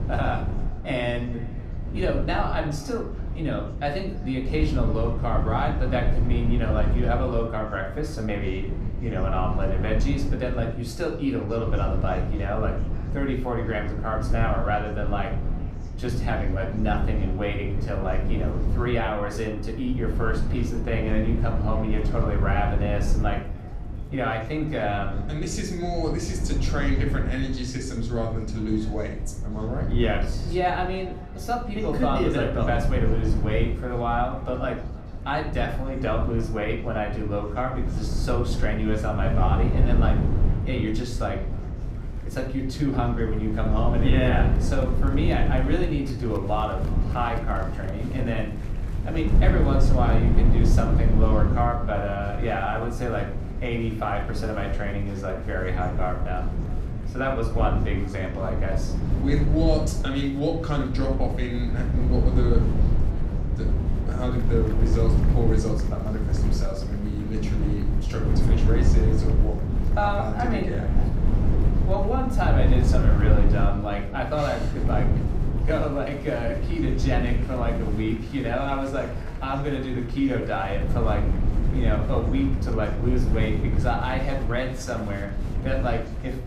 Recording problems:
echo of what is said; faint; throughout; 300 ms later, 25 dB below the speech
room echo; slight; dies away in 0.4 s
off-mic speech; somewhat distant
low rumble; loud; throughout; 9 dB below the speech
chatter from many people; faint; throughout; 20 dB below the speech

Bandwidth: 14.5 kHz